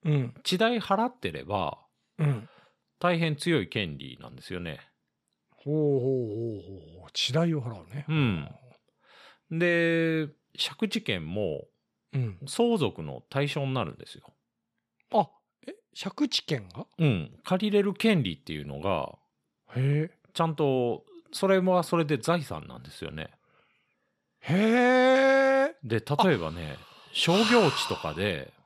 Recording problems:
none

